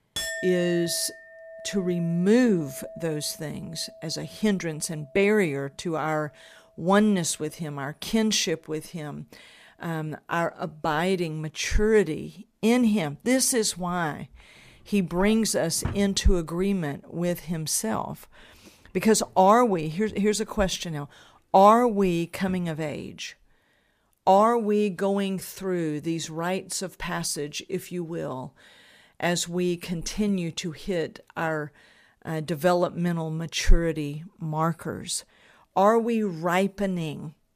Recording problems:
household noises; noticeable; throughout; 15 dB below the speech

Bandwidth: 15 kHz